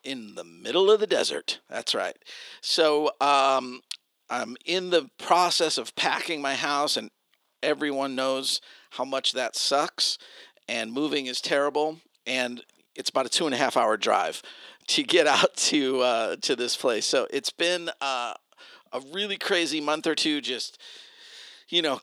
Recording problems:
thin; somewhat; fading below 350 Hz

